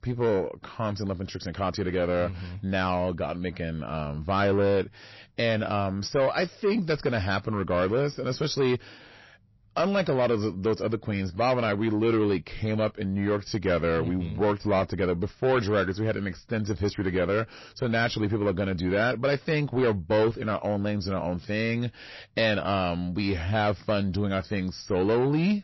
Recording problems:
distortion; slight; 10 dB below the speech
garbled, watery; slightly; nothing above 6 kHz

